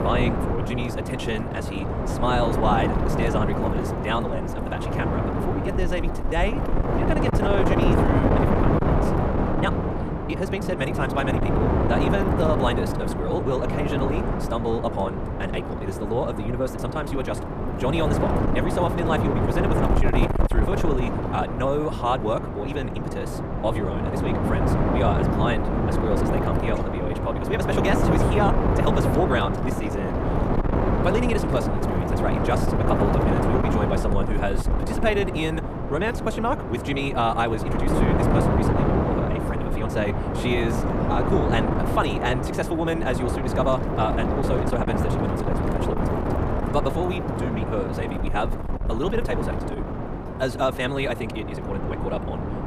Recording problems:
wrong speed, natural pitch; too fast; 1.6 times normal speed
wind noise on the microphone; heavy; as loud as the speech

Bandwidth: 14.5 kHz